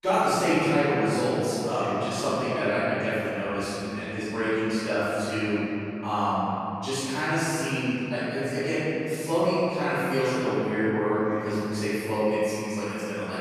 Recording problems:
room echo; strong; dies away in 2.9 s
off-mic speech; far

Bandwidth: 15 kHz